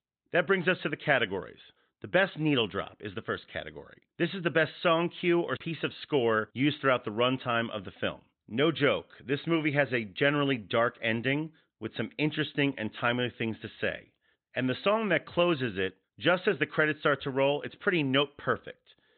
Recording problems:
high frequencies cut off; severe; nothing above 4 kHz

